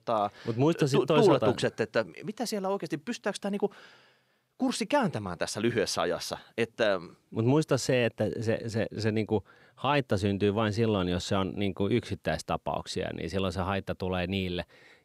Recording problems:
none

